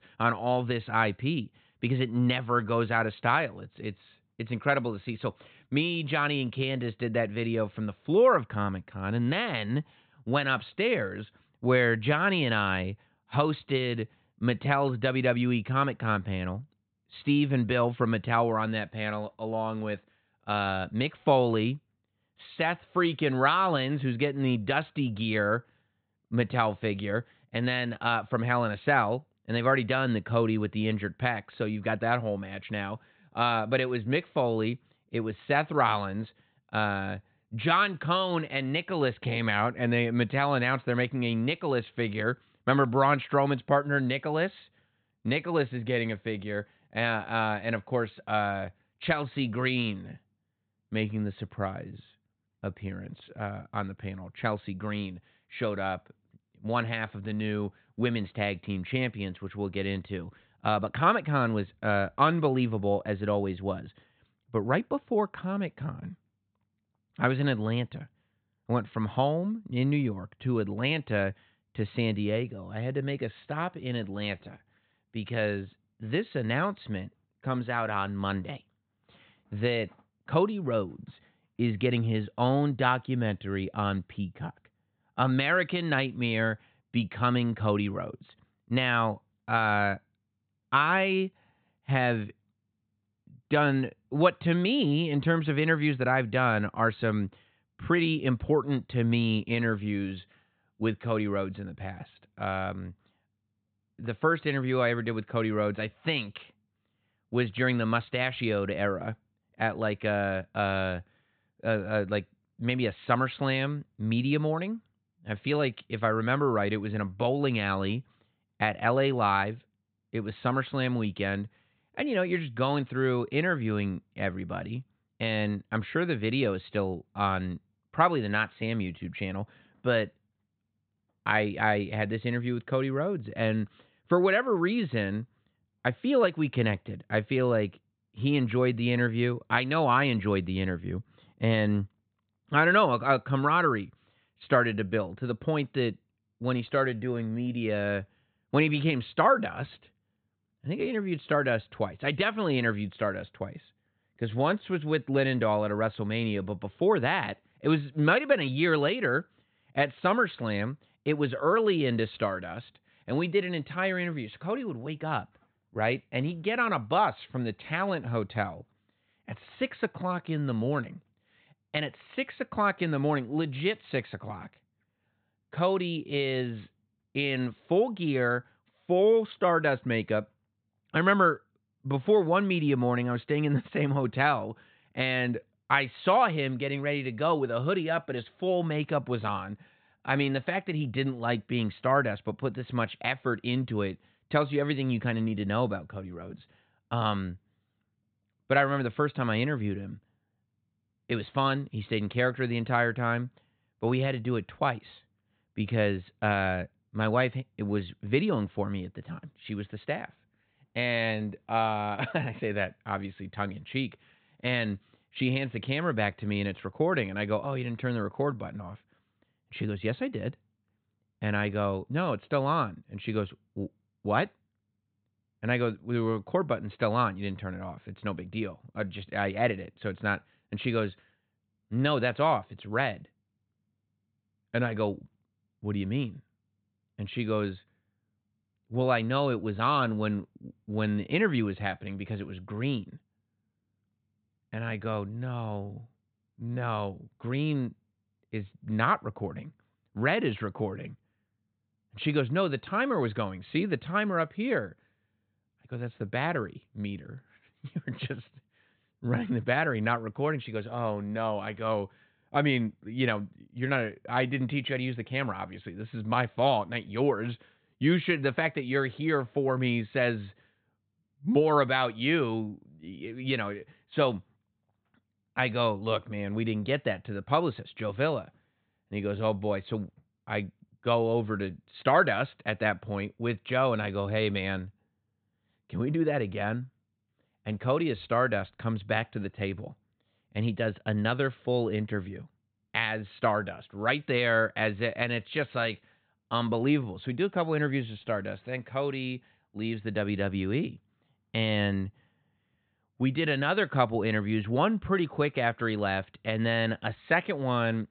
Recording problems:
high frequencies cut off; severe; nothing above 4 kHz

